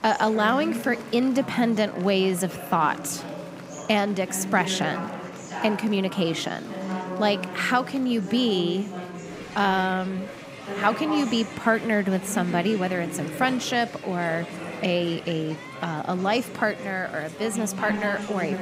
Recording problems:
chatter from many people; loud; throughout; 9 dB below the speech

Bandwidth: 15.5 kHz